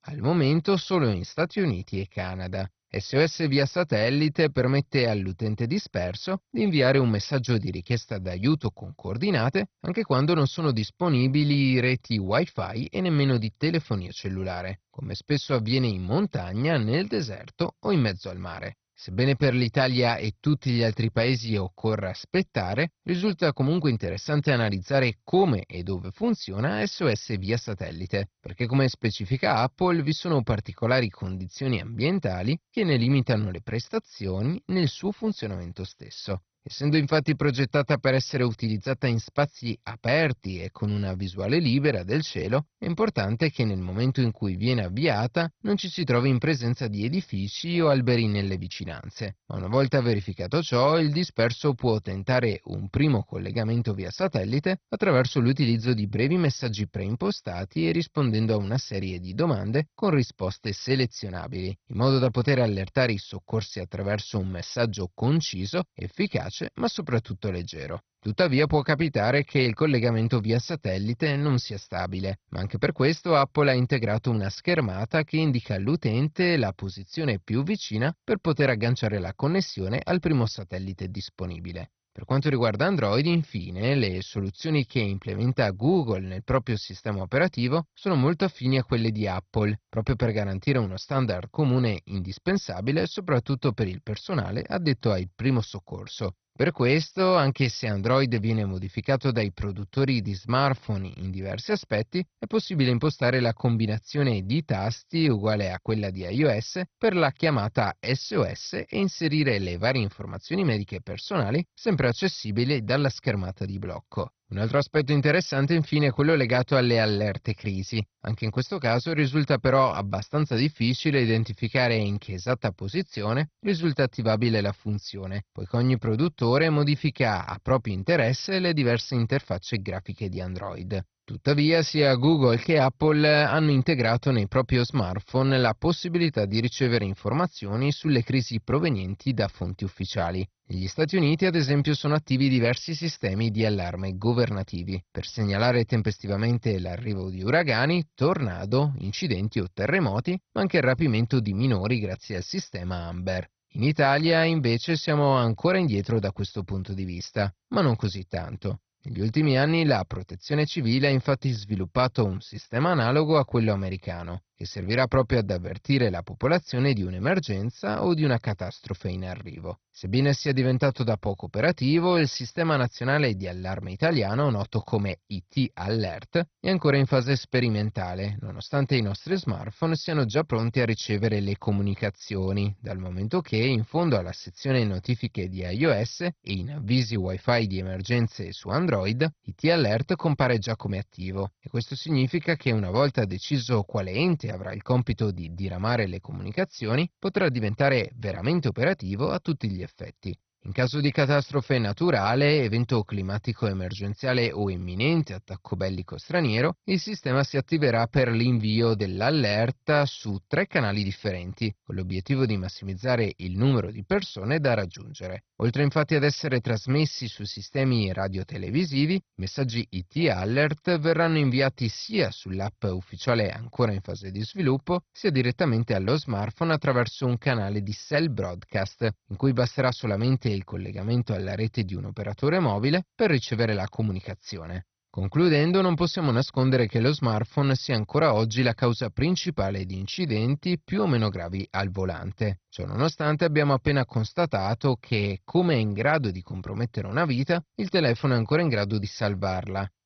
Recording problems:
garbled, watery; badly; nothing above 6 kHz

